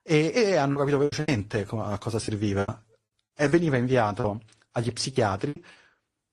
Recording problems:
garbled, watery; slightly; nothing above 10 kHz
choppy; very; at 0.5 s, from 2 to 3.5 s and from 4 to 5.5 s; 16% of the speech affected

